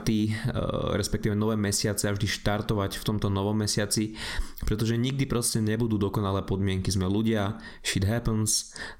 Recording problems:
squashed, flat; heavily

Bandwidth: 16 kHz